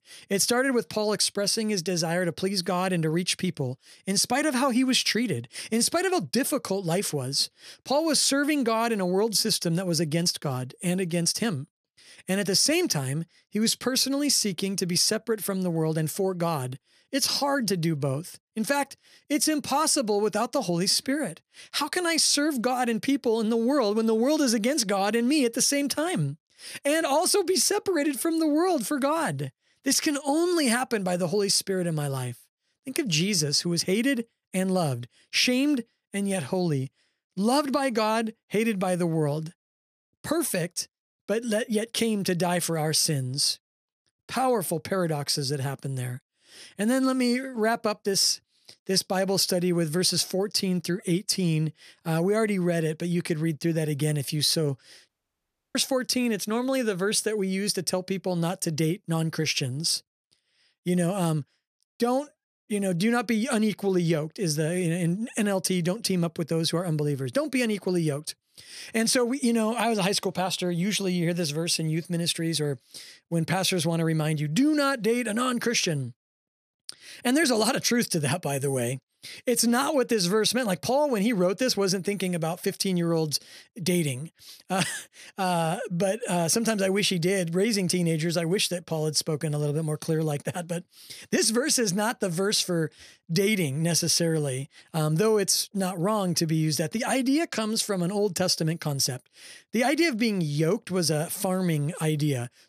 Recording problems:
audio cutting out; at 55 s for 0.5 s

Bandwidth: 14.5 kHz